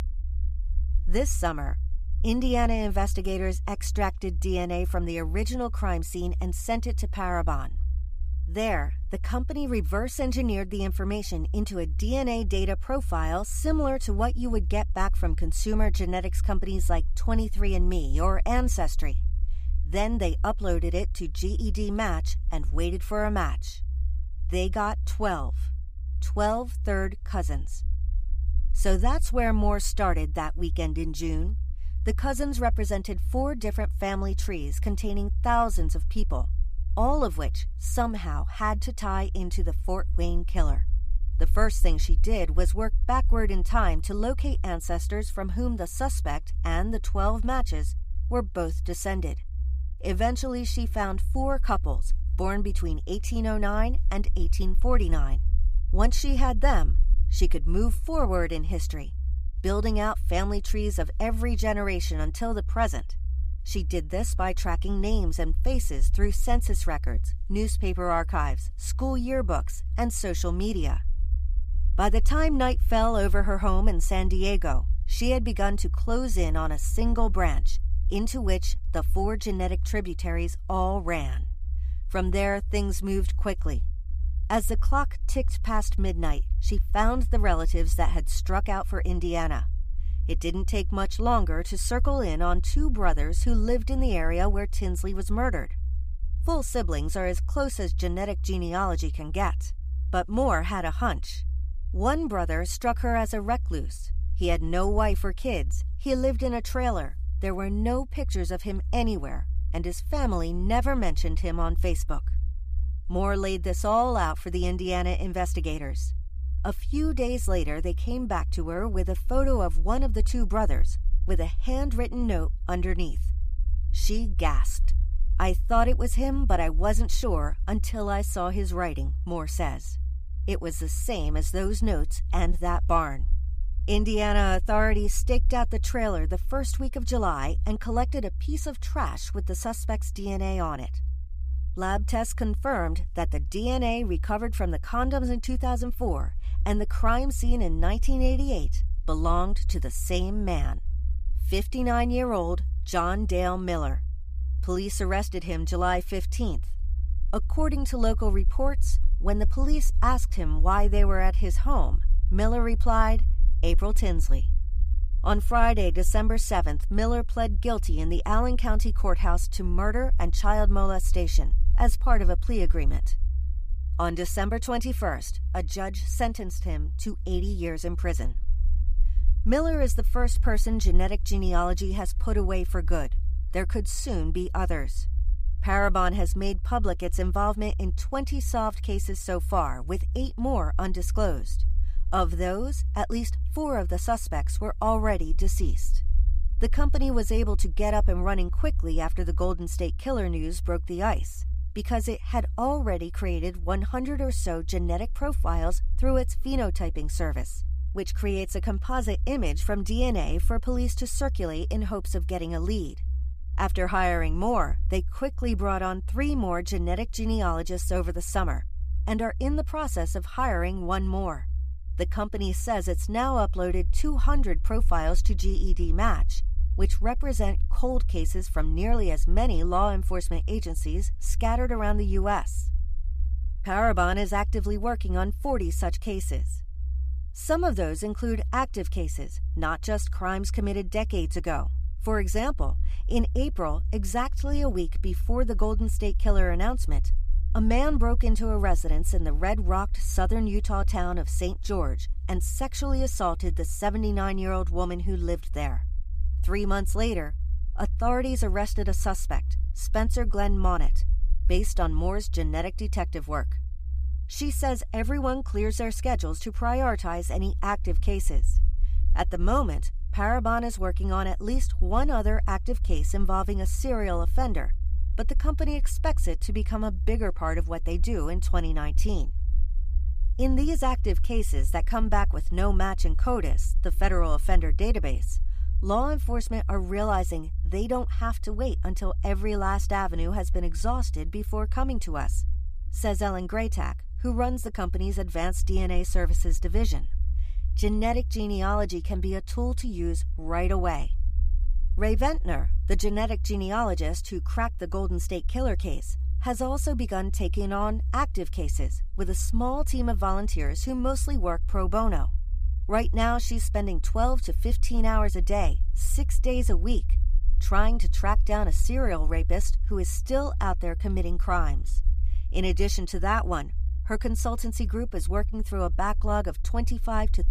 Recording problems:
low rumble; faint; throughout; 20 dB below the speech

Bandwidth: 15 kHz